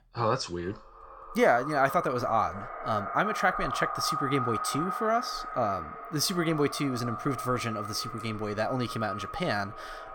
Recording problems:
echo of what is said; strong; throughout; 350 ms later, 6 dB below the speech

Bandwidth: 18.5 kHz